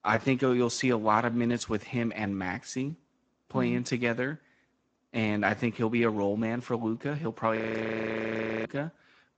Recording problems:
garbled, watery; slightly; nothing above 8 kHz
audio freezing; at 7.5 s for 1 s

